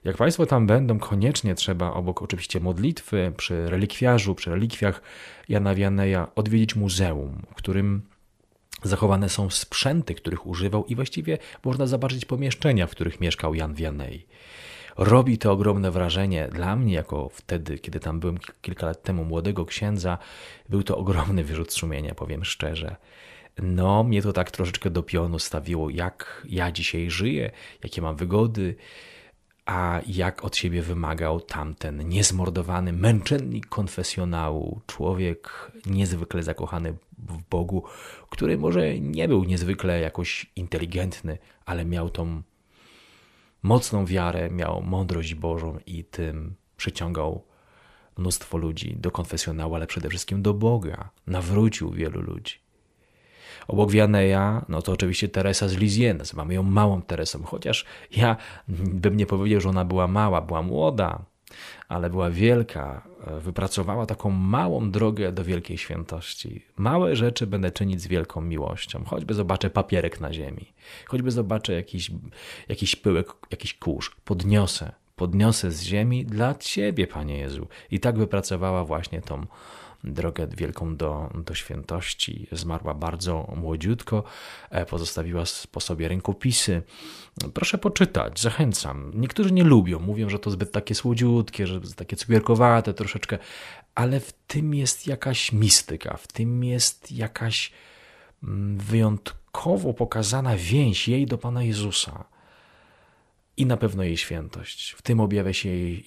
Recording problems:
none

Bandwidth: 14.5 kHz